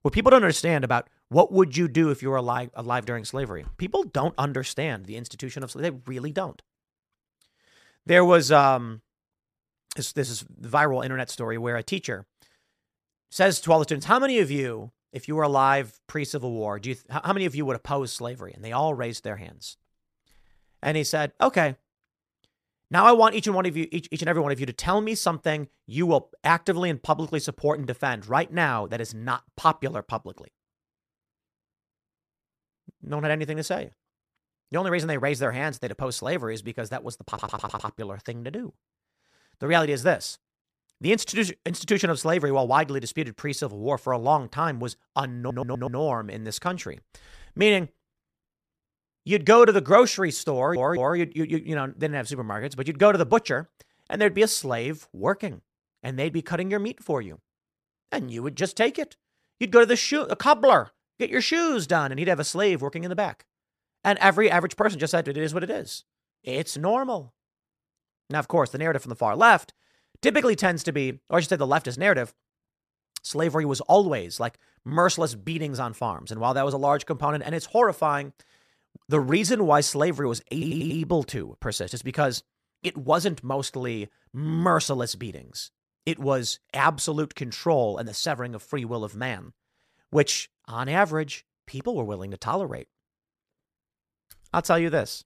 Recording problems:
audio stuttering; 4 times, first at 37 s

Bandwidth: 14.5 kHz